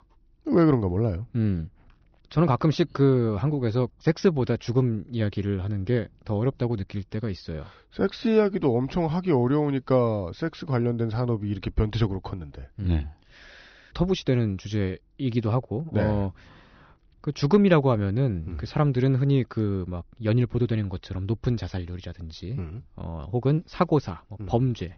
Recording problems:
high frequencies cut off; noticeable; nothing above 6 kHz

